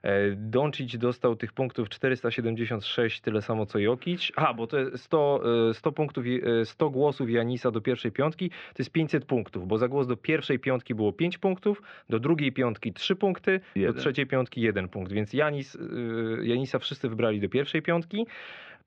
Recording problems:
muffled; very; fading above 3.5 kHz

